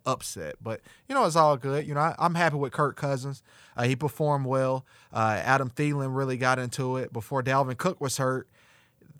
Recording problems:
none

